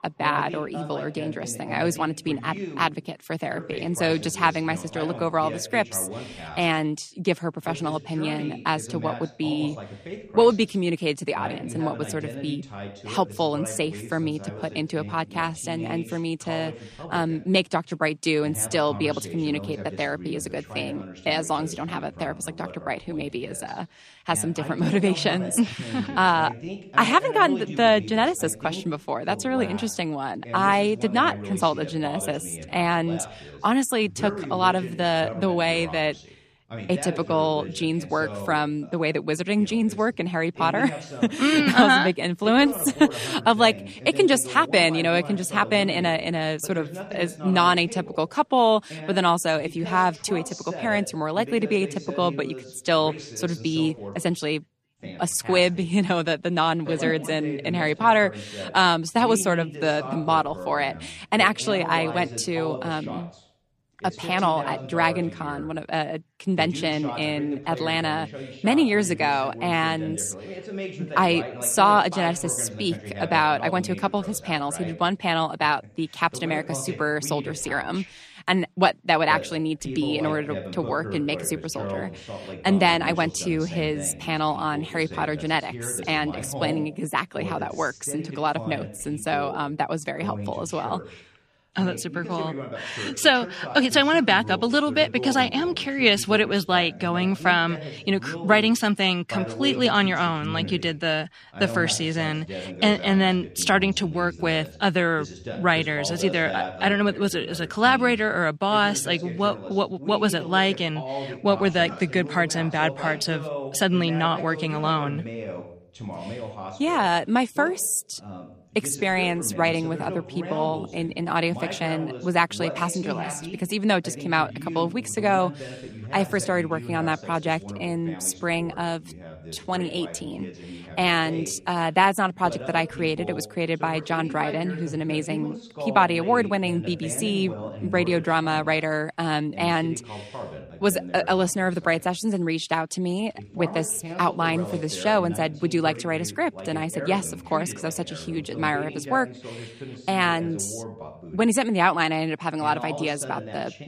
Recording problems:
voice in the background; noticeable; throughout; 15 dB below the speech

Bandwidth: 14.5 kHz